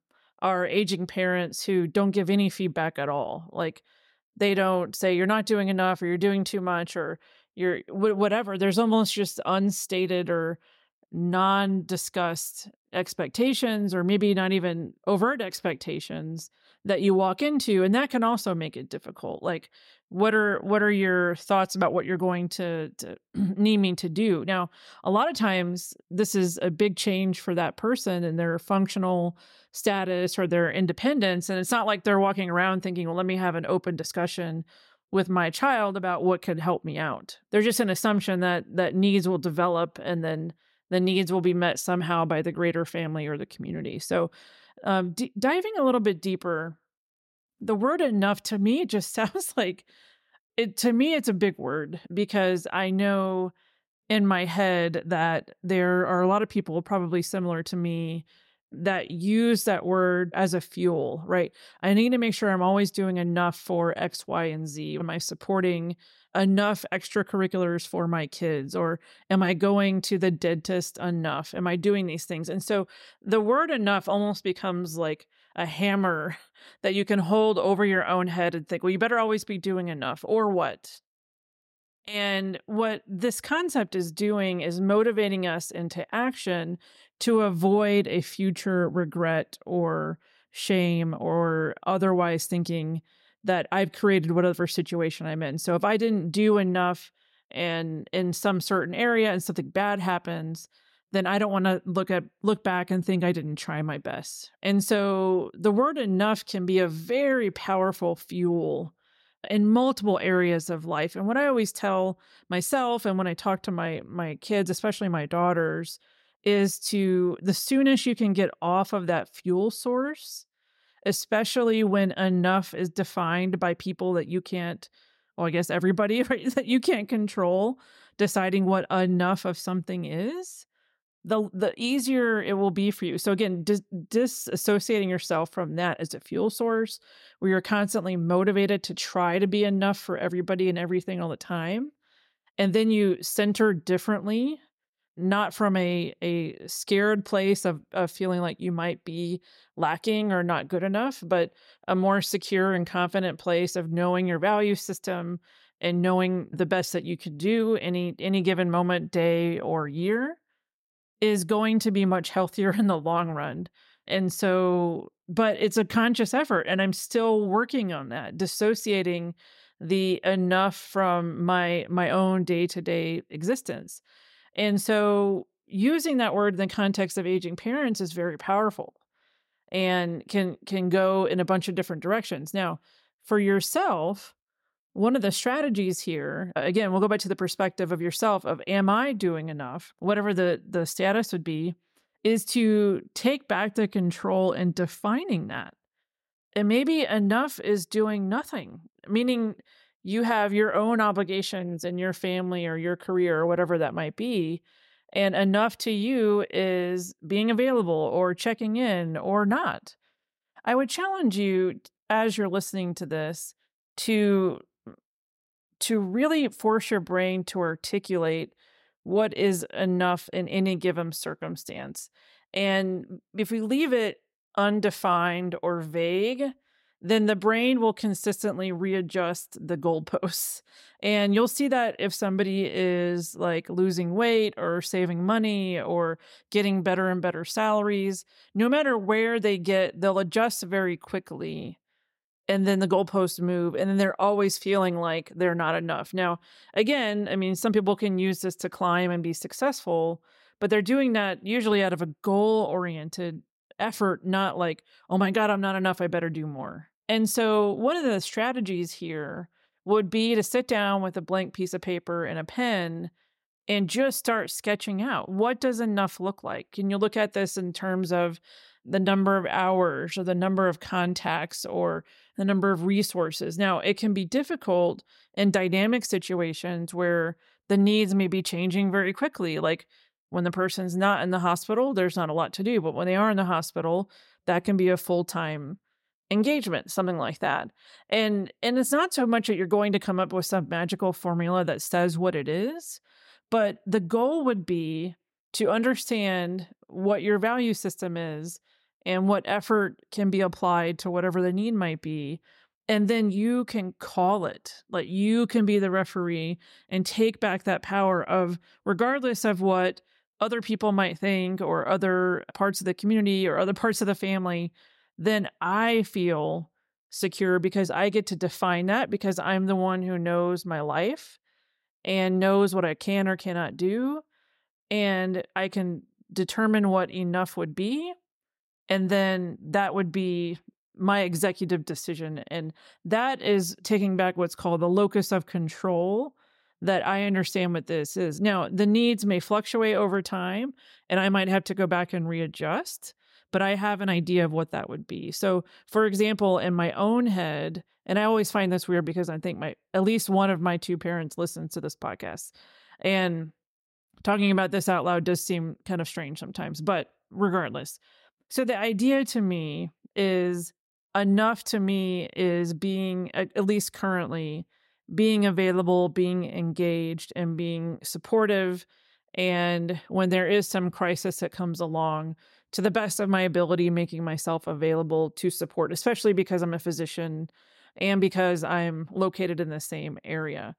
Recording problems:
none

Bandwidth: 16 kHz